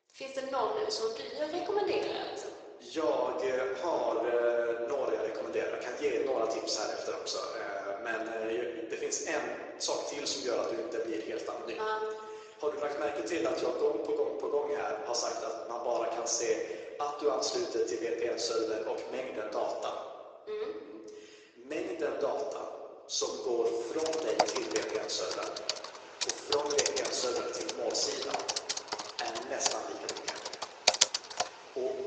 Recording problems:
thin; very; fading below 350 Hz
room echo; noticeable; dies away in 1.3 s
off-mic speech; somewhat distant
garbled, watery; slightly
keyboard typing; loud; from 24 to 31 s; peak 5 dB above the speech

